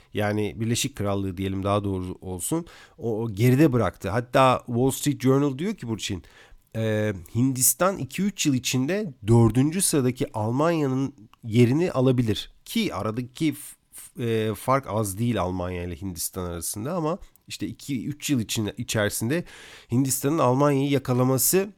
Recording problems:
none

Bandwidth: 17 kHz